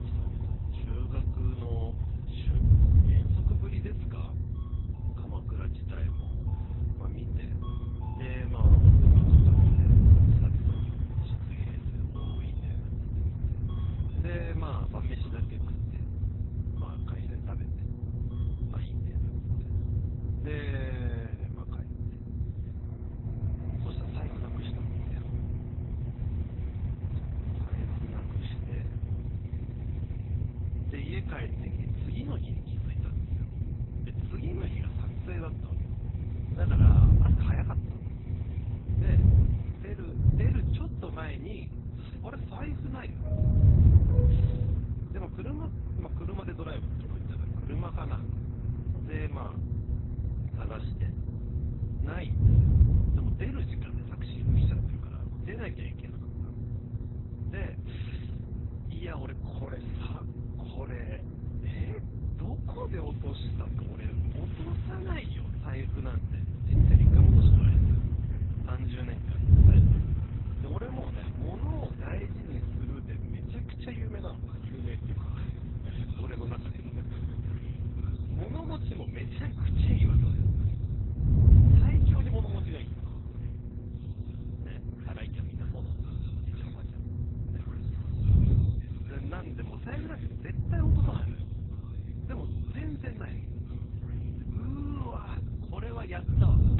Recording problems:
garbled, watery; badly
high frequencies cut off; severe; nothing above 4 kHz
wind noise on the microphone; heavy; 4 dB above the speech
electrical hum; loud; throughout; 60 Hz, 7 dB below the speech
train or aircraft noise; noticeable; throughout; 10 dB below the speech

